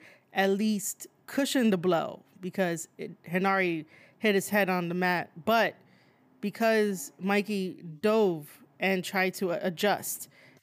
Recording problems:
none

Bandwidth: 15 kHz